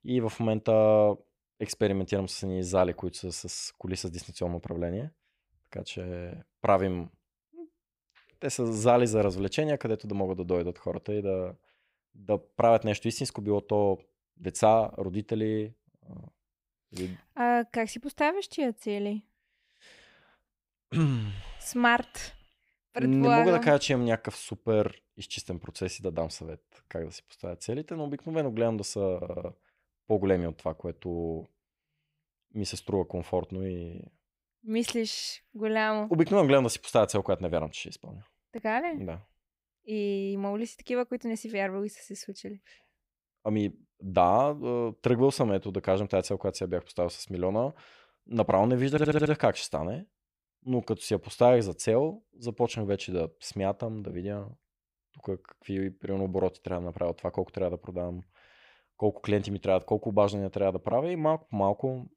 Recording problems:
audio stuttering; at 29 s and at 49 s

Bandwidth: 15.5 kHz